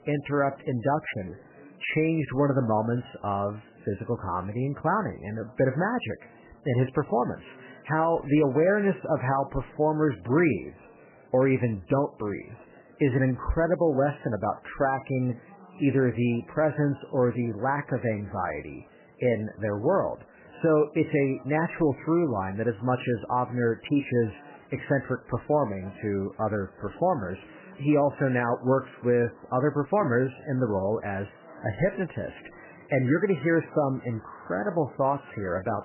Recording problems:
garbled, watery; badly; nothing above 3 kHz
murmuring crowd; faint; throughout; 25 dB below the speech

